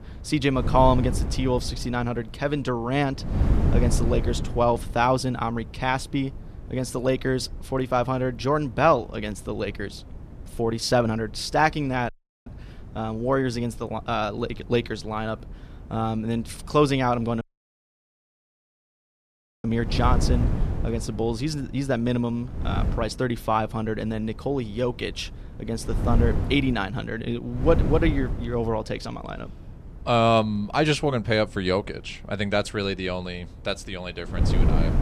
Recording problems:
wind noise on the microphone; occasional gusts; 15 dB below the speech
audio cutting out; at 12 s and at 17 s for 2 s

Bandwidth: 14 kHz